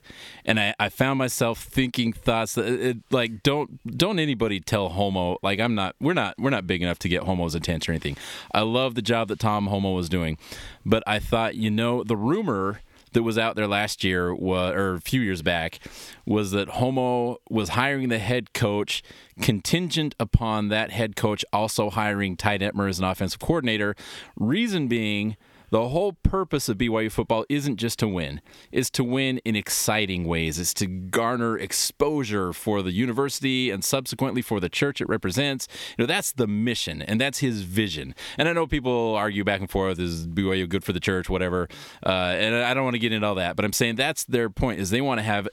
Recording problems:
squashed, flat; somewhat

